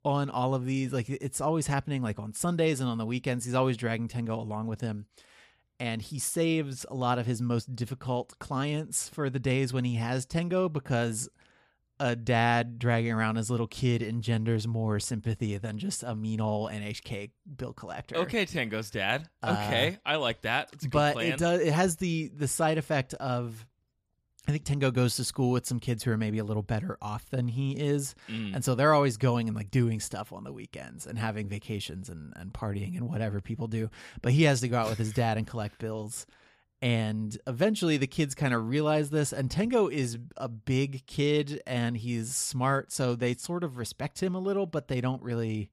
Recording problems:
none

